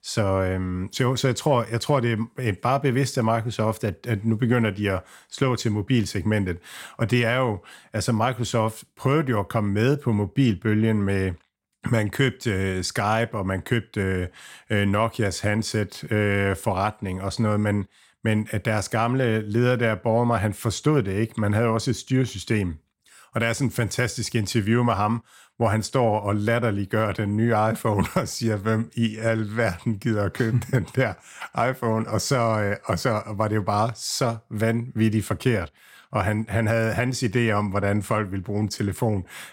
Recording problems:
none

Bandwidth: 16.5 kHz